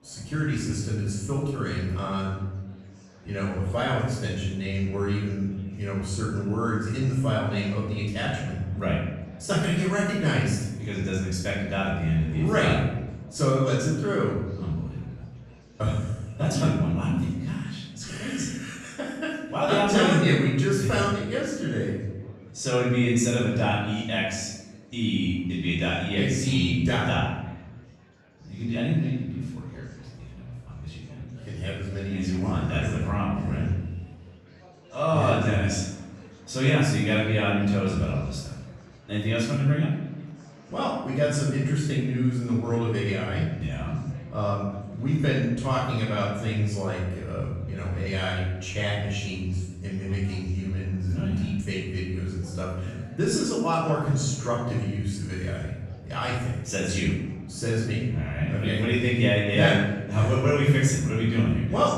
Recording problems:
off-mic speech; far
room echo; noticeable; dies away in 0.9 s
murmuring crowd; faint; throughout; 25 dB below the speech

